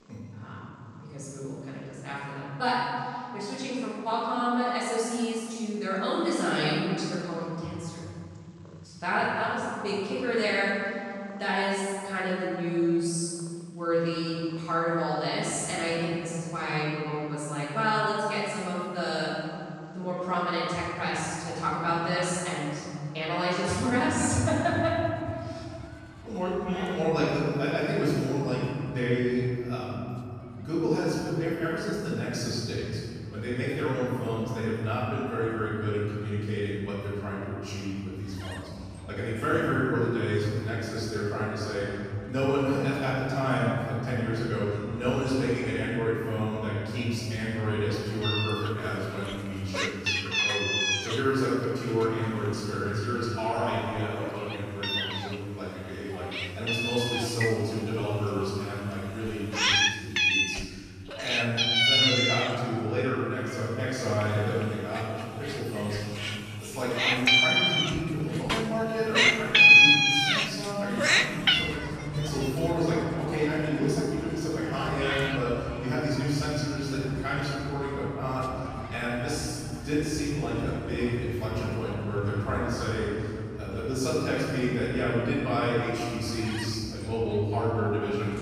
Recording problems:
room echo; strong; dies away in 3 s
off-mic speech; far
animal sounds; very loud; throughout; 5 dB above the speech

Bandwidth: 14.5 kHz